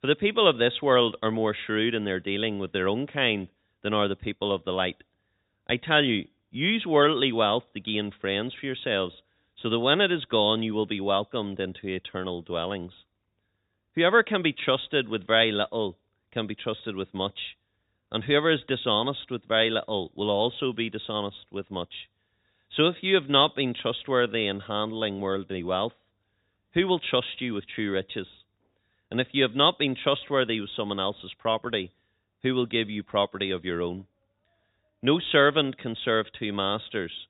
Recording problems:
high frequencies cut off; severe; nothing above 4 kHz

